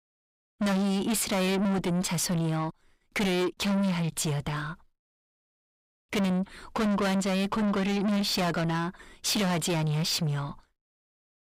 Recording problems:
distortion; heavy; 6 dB below the speech

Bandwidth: 15.5 kHz